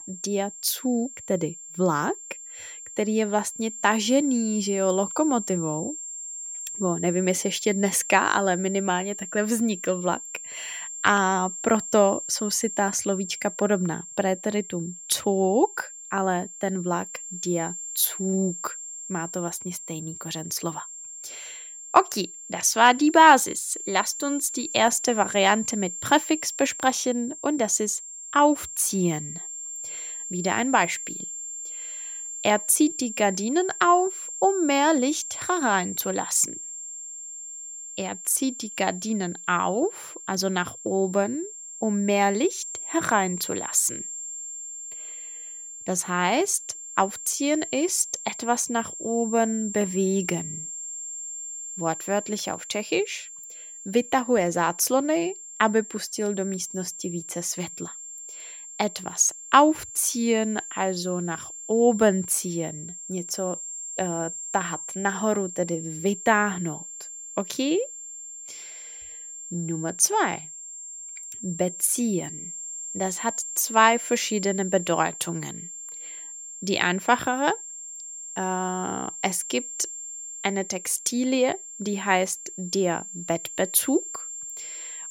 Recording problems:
high-pitched whine; loud; throughout; 7.5 kHz, 10 dB below the speech

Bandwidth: 16.5 kHz